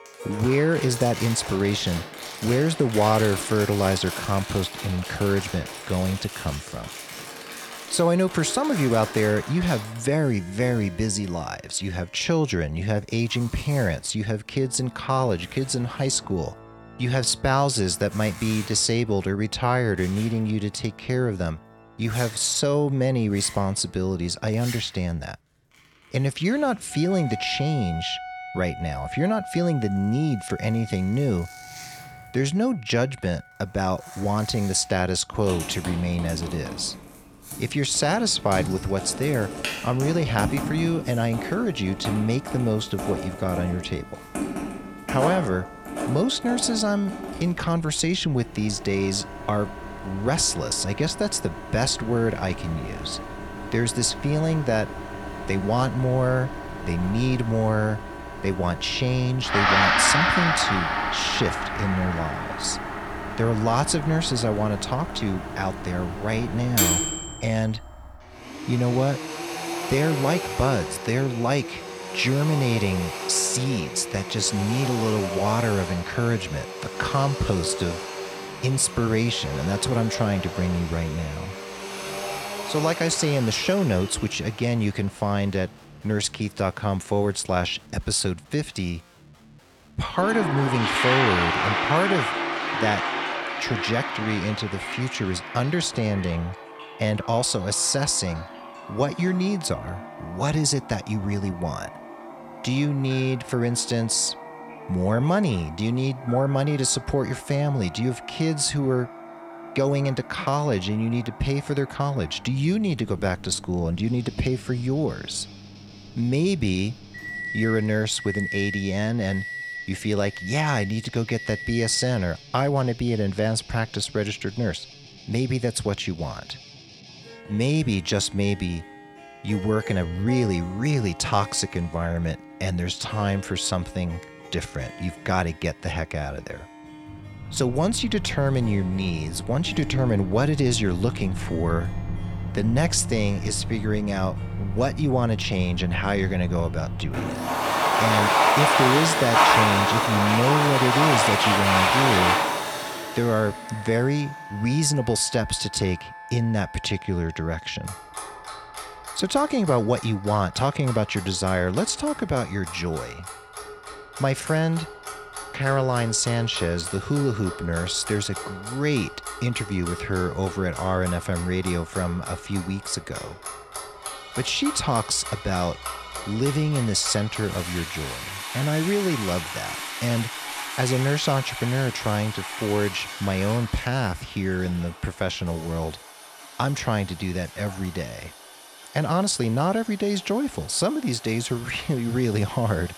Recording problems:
household noises; loud; throughout; 5 dB below the speech
background music; noticeable; throughout; 10 dB below the speech

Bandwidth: 17 kHz